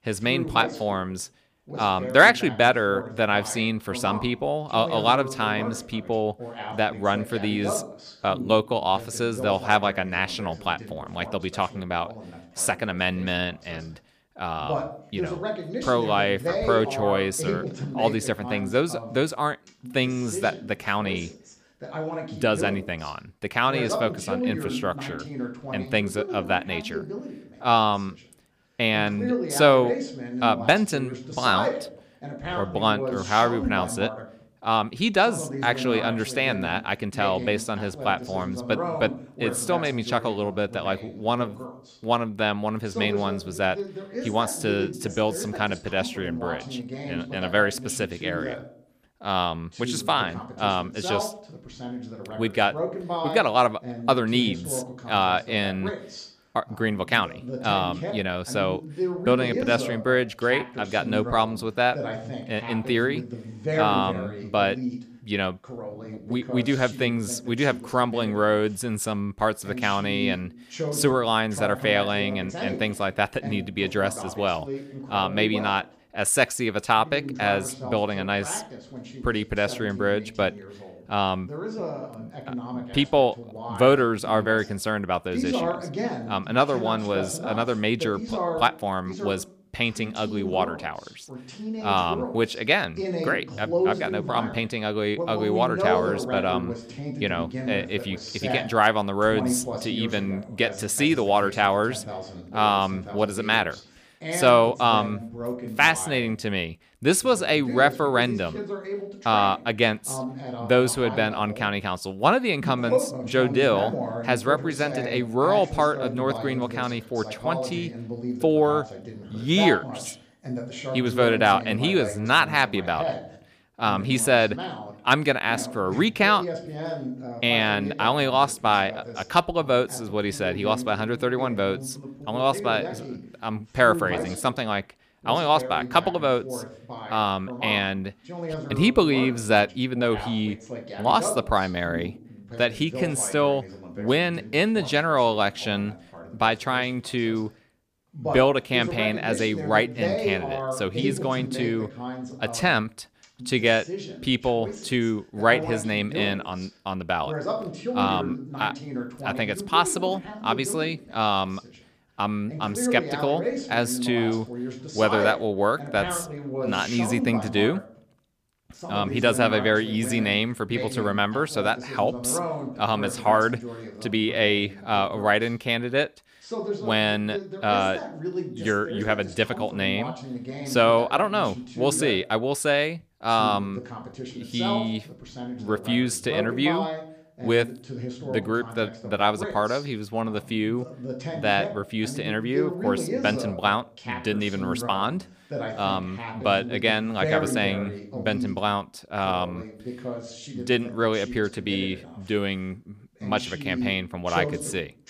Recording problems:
voice in the background; loud; throughout; 9 dB below the speech

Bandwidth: 15 kHz